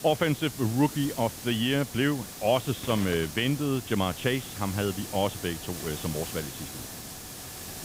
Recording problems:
high frequencies cut off; severe; nothing above 4 kHz
hiss; loud; throughout; 10 dB below the speech

